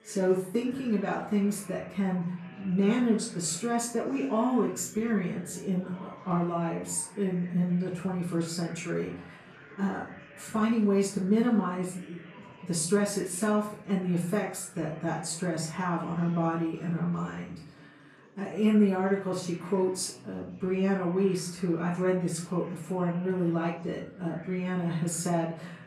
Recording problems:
off-mic speech; far
room echo; slight; dies away in 0.5 s
chatter from many people; faint; throughout; 20 dB below the speech

